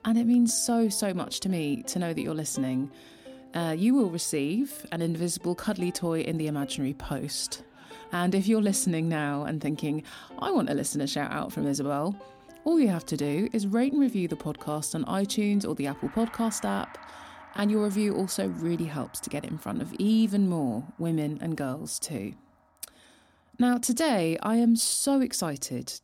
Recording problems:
background music; faint; throughout; 20 dB below the speech

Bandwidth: 17 kHz